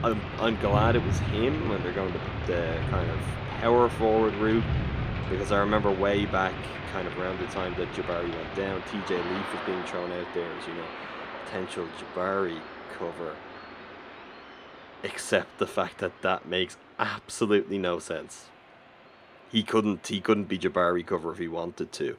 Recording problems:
rain or running water; loud; throughout; 5 dB below the speech

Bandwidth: 14.5 kHz